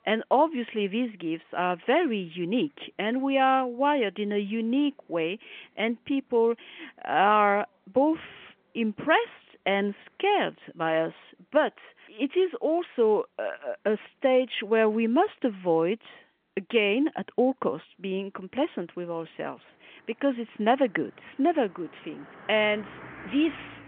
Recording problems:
phone-call audio; nothing above 3.5 kHz
traffic noise; faint; throughout; 25 dB below the speech

